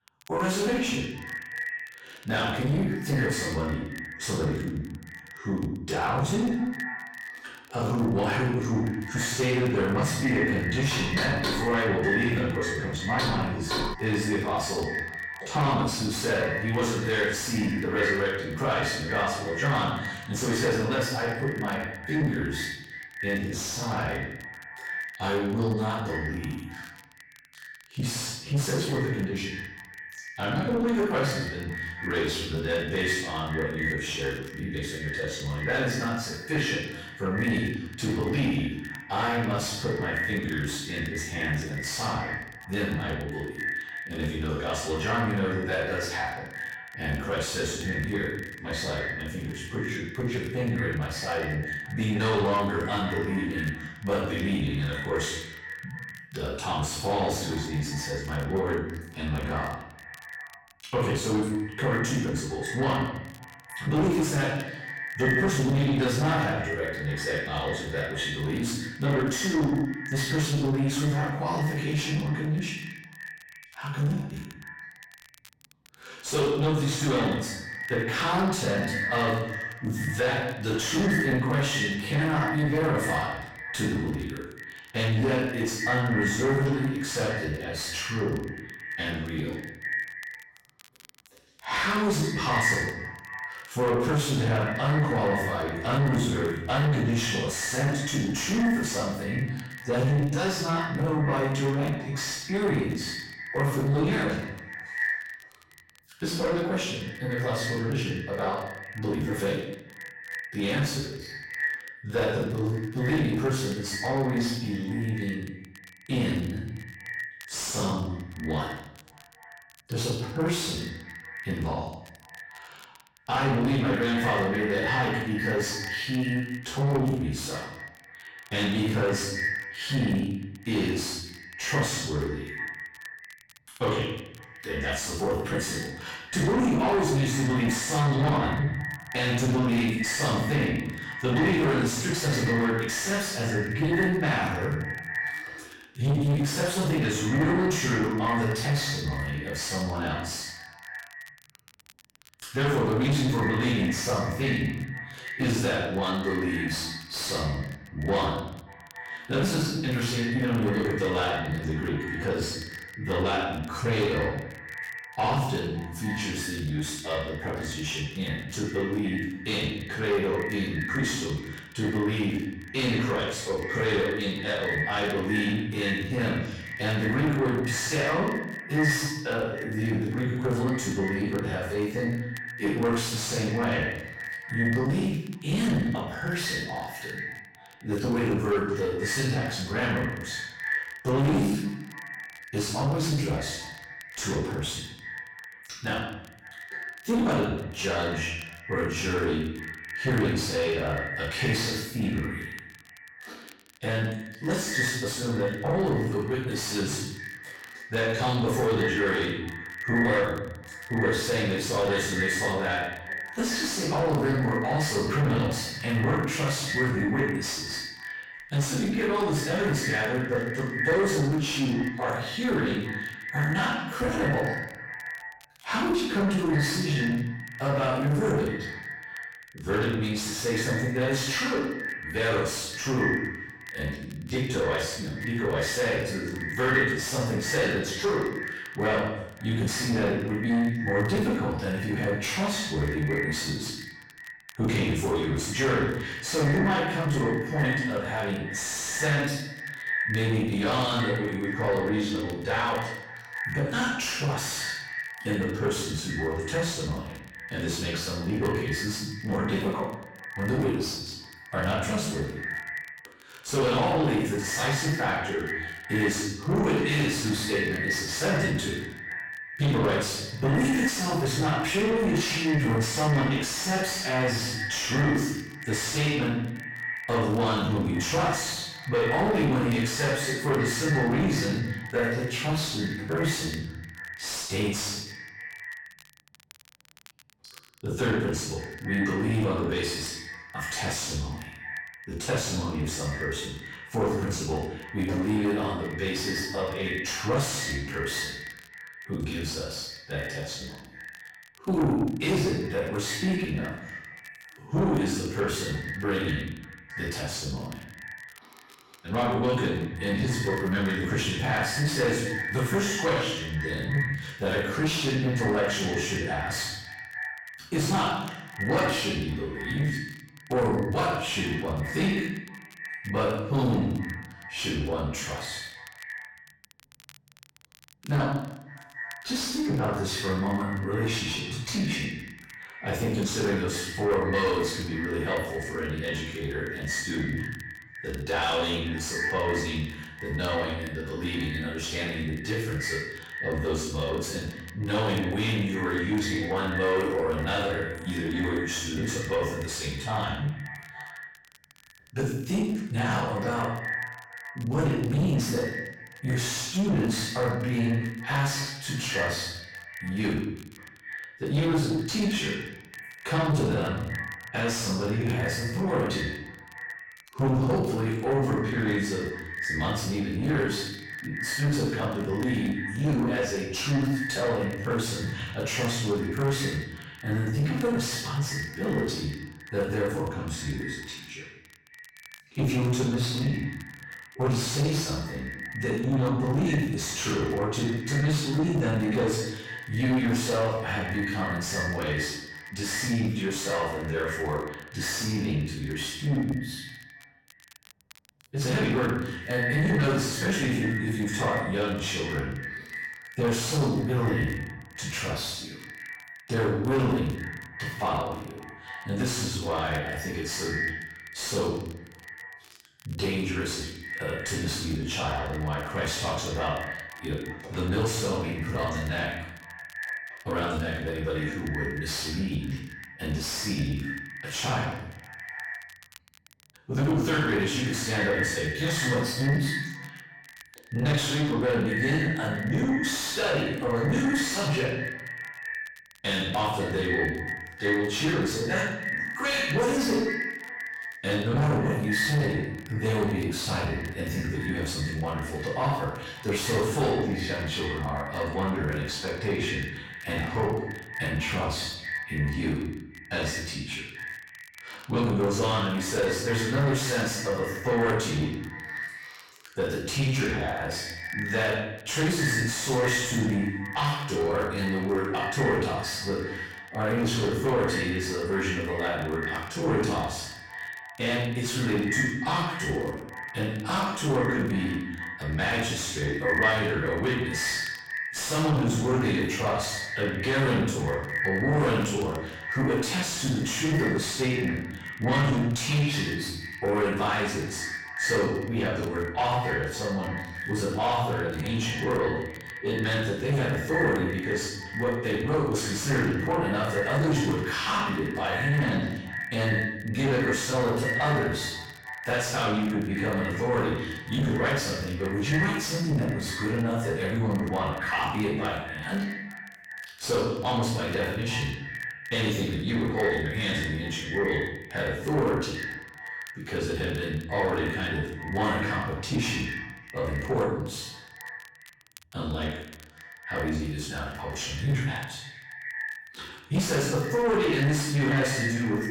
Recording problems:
distortion; heavy; 7 dB below the speech
echo of what is said; strong; throughout; 280 ms later, 8 dB below the speech
off-mic speech; far
room echo; noticeable; dies away in 0.7 s
crackle, like an old record; faint; 25 dB below the speech
door banging; loud; from 11 to 14 s; peak level with the speech

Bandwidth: 16.5 kHz